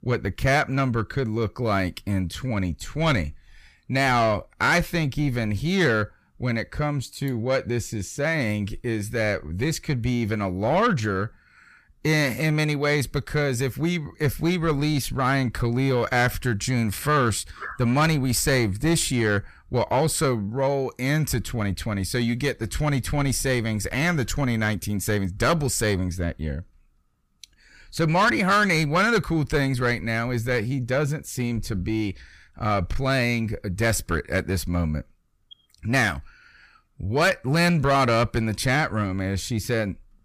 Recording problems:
distortion; slight; 10 dB below the speech

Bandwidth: 15 kHz